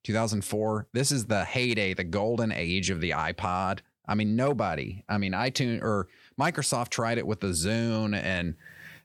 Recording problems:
none

